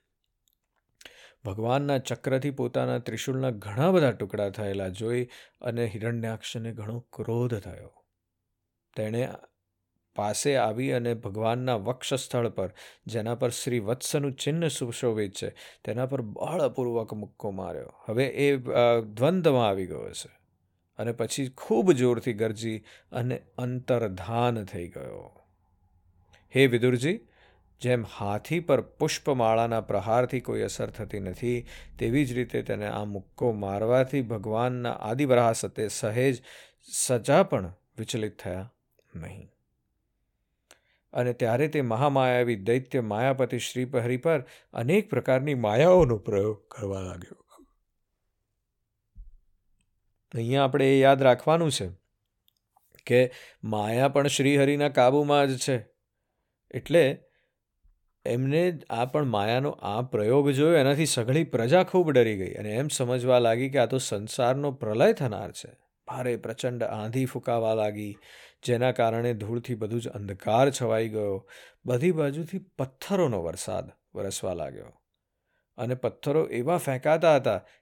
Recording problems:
uneven, jittery; strongly; from 7 s to 1:13

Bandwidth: 17.5 kHz